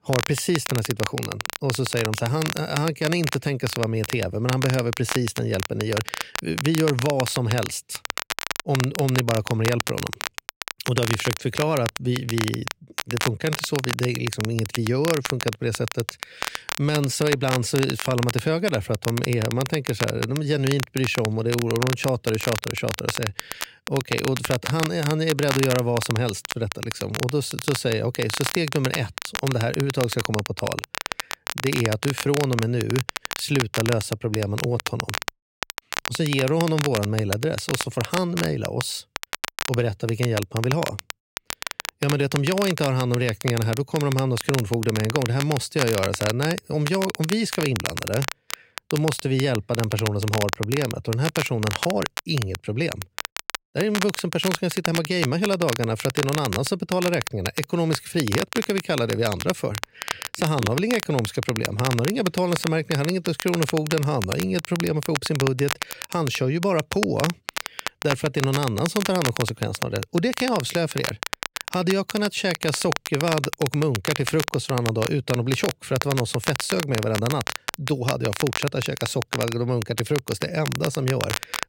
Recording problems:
crackle, like an old record; loud; 6 dB below the speech

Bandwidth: 16 kHz